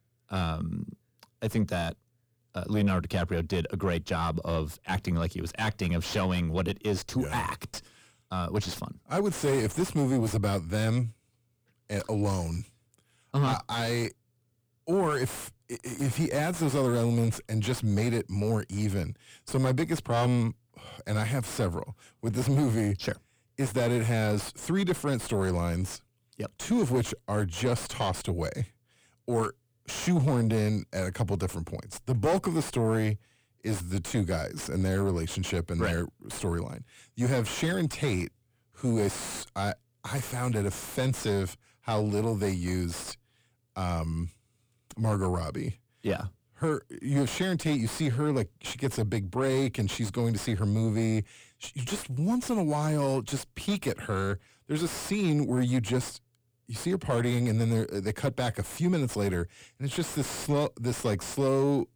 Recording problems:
distortion; heavy; 6 dB below the speech

